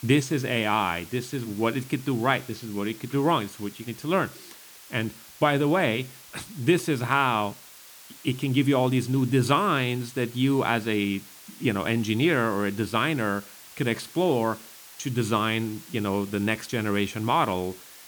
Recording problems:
hiss; noticeable; throughout; 20 dB below the speech

